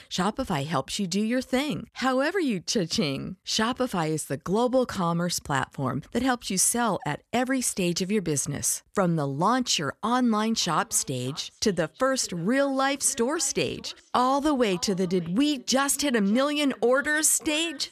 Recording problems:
echo of what is said; faint; from 11 s on; 570 ms later, 25 dB below the speech

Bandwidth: 14 kHz